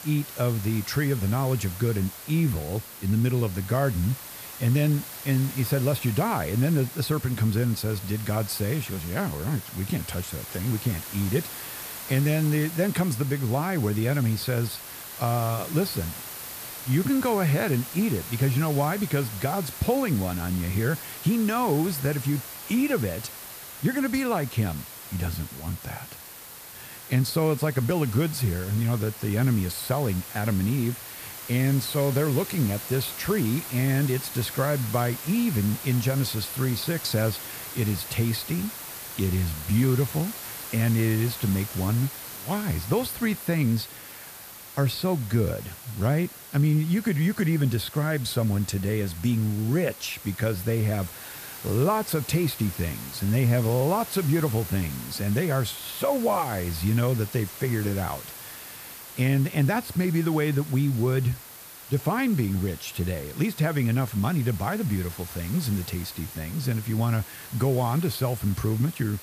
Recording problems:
hiss; noticeable; throughout; 10 dB below the speech

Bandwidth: 14.5 kHz